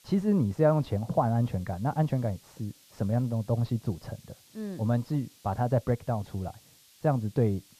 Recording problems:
muffled; very; fading above 4 kHz
hiss; faint; throughout; 25 dB below the speech

